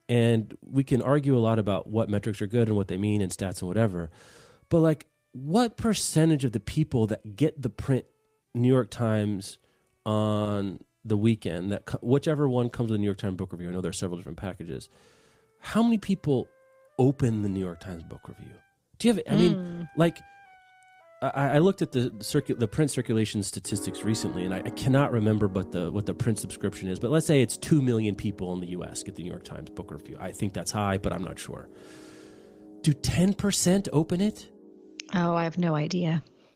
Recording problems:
garbled, watery; slightly; nothing above 15.5 kHz
background music; noticeable; throughout; 20 dB below the speech

